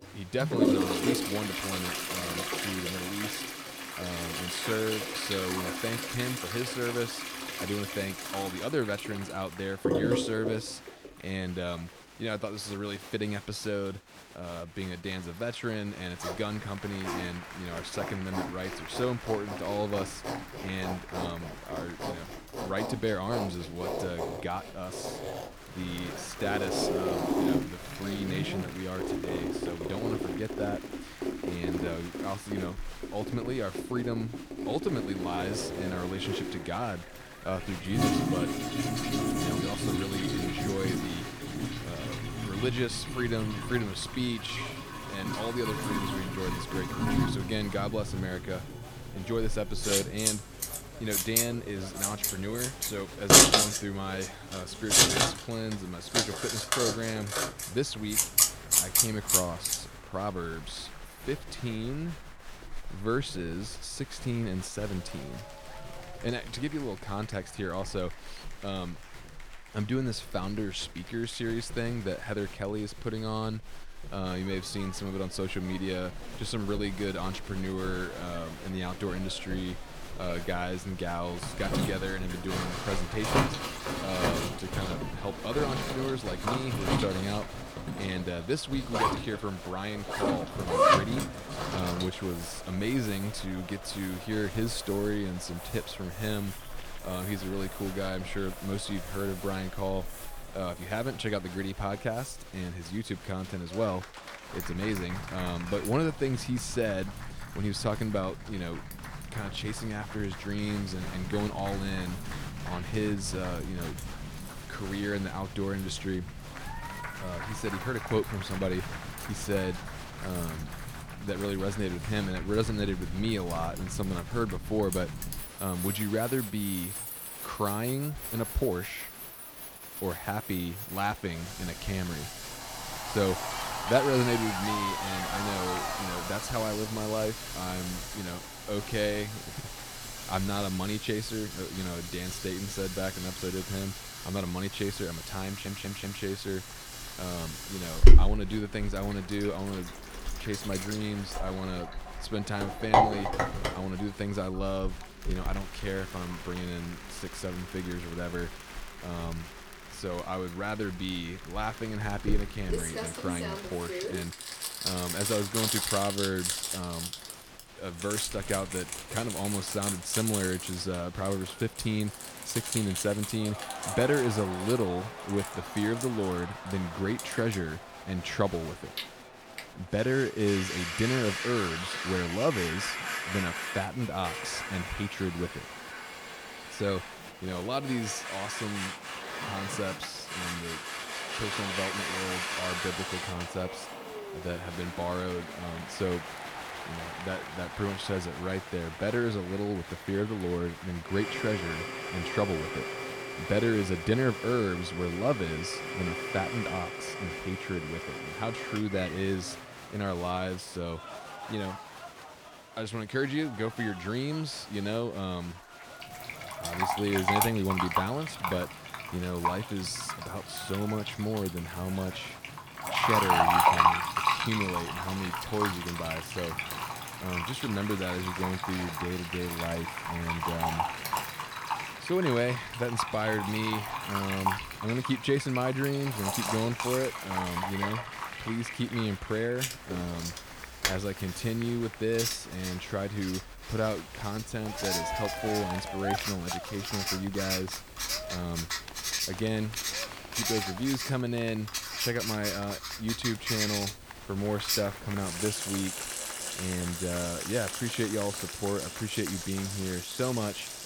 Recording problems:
household noises; very loud; throughout; 1 dB above the speech
crowd noise; noticeable; throughout; 10 dB below the speech
audio stuttering; at 2:25

